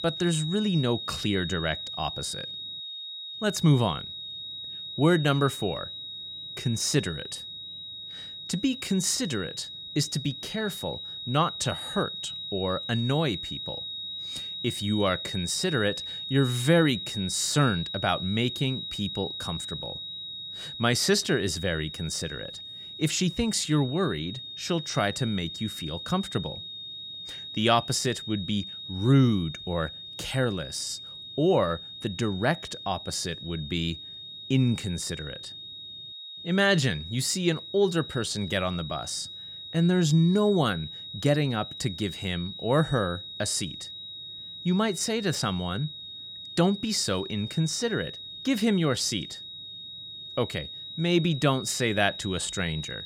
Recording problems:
high-pitched whine; loud; throughout; 4 kHz, 9 dB below the speech

